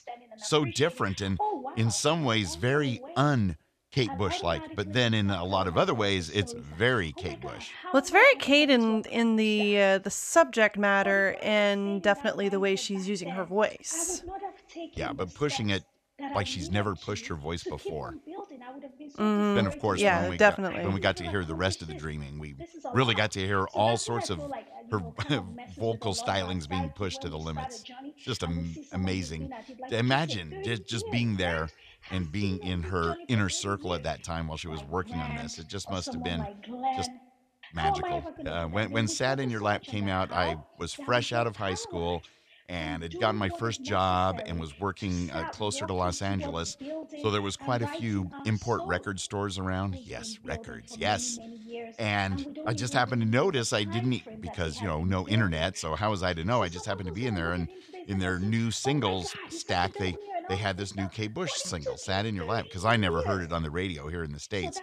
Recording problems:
voice in the background; noticeable; throughout; 10 dB below the speech

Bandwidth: 14 kHz